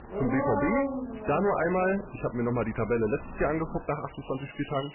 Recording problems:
garbled, watery; badly; nothing above 2.5 kHz
distortion; slight; 12% of the sound clipped
animal sounds; loud; throughout; 5 dB below the speech
crackling; faint; at 1 s and at 3 s; 25 dB below the speech

